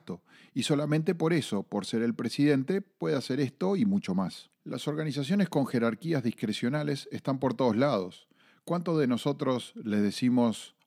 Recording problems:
none

